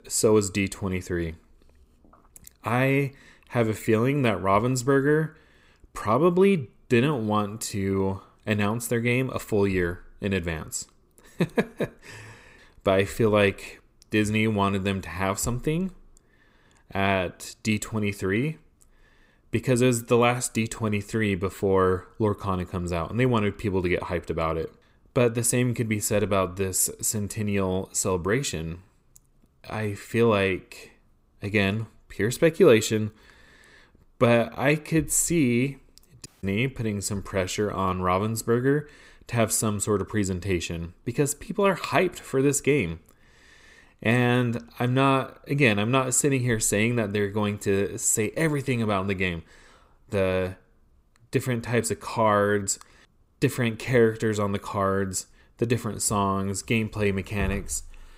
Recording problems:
audio cutting out; at 36 s

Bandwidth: 15.5 kHz